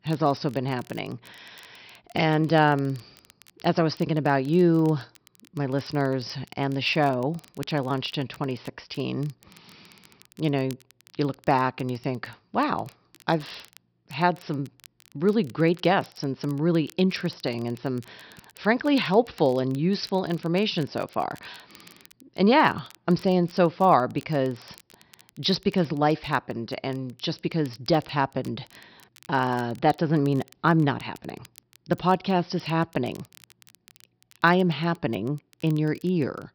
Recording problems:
high frequencies cut off; noticeable; nothing above 5.5 kHz
crackle, like an old record; faint; 30 dB below the speech

